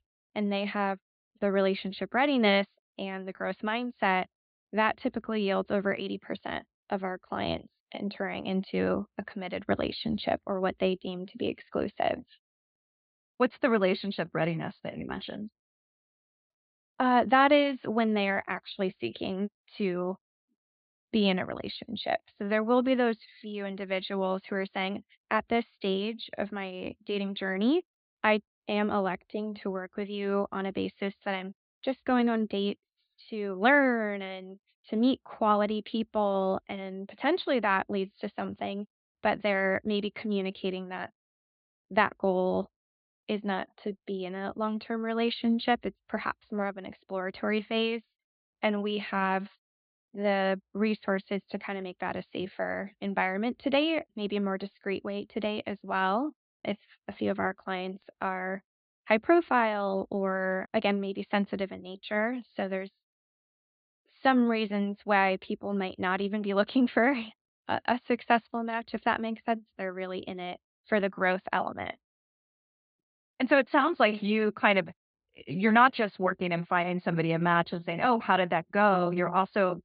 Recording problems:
high frequencies cut off; severe; nothing above 4.5 kHz

